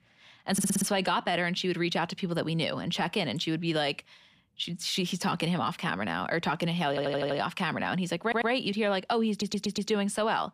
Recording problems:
audio stuttering; 4 times, first at 0.5 s

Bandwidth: 14.5 kHz